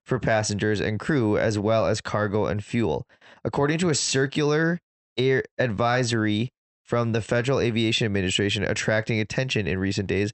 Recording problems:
high frequencies cut off; noticeable; nothing above 8 kHz

